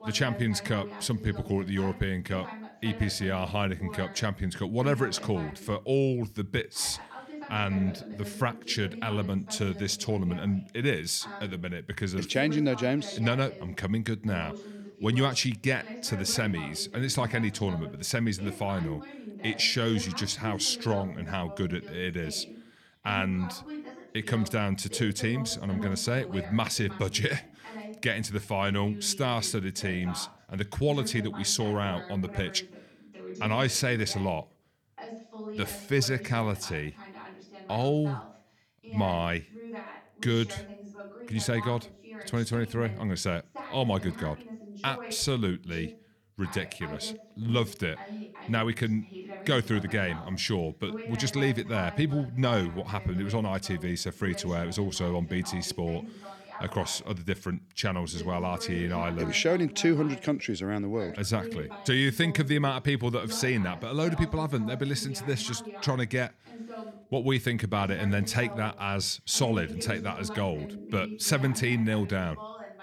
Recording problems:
voice in the background; noticeable; throughout; 15 dB below the speech

